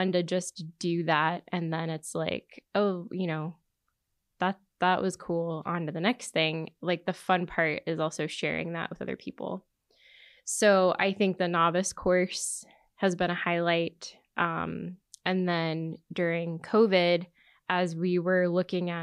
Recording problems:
abrupt cut into speech; at the start and the end

